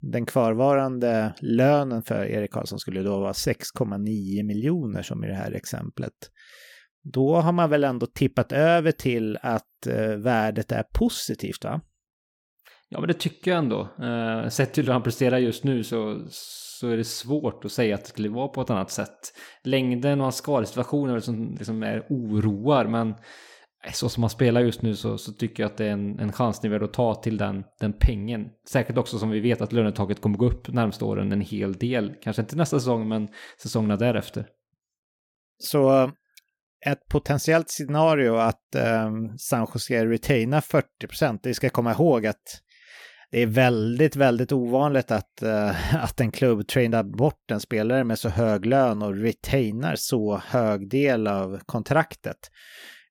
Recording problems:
none

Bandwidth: 18 kHz